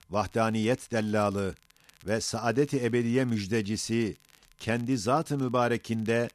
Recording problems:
crackle, like an old record; faint; 30 dB below the speech

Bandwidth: 14 kHz